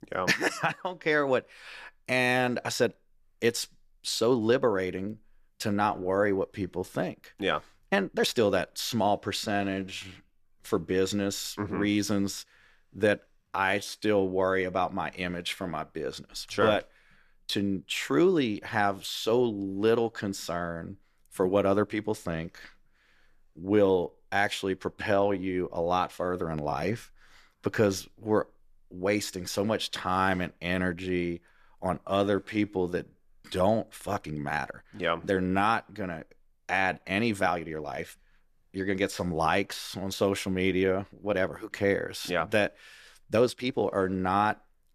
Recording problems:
uneven, jittery; strongly; from 2.5 to 44 s

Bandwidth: 14.5 kHz